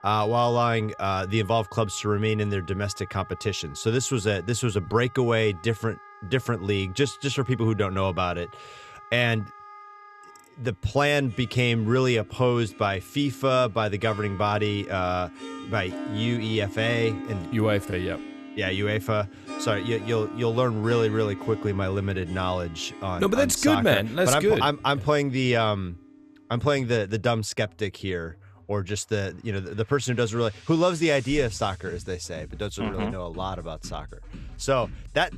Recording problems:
background music; noticeable; throughout; 15 dB below the speech

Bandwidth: 14 kHz